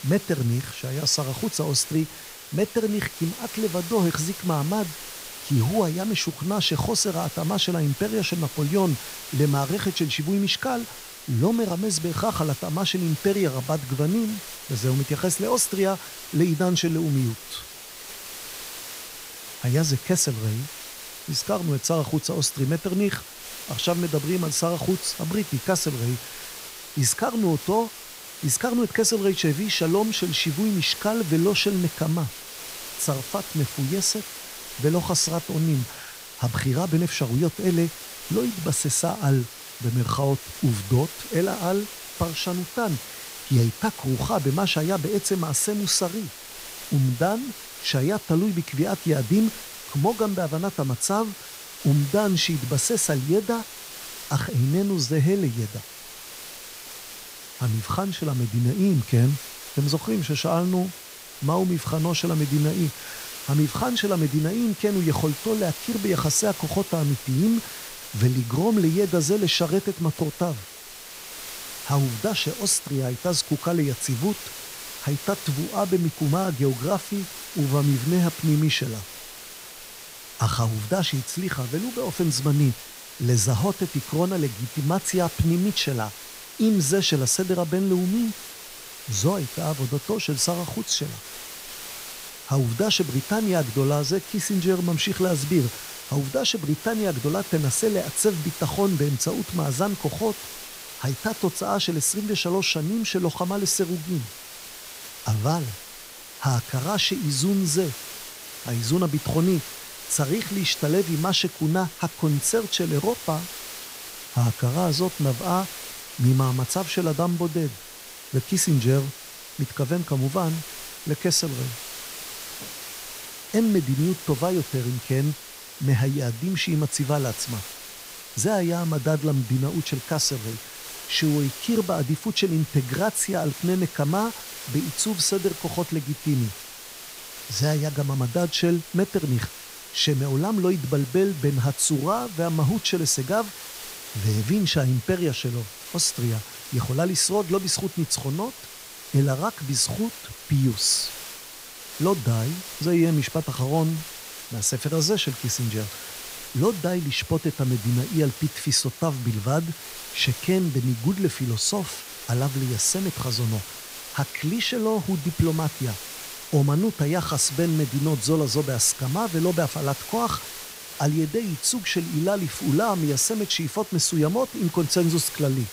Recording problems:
hiss; noticeable; throughout; 10 dB below the speech

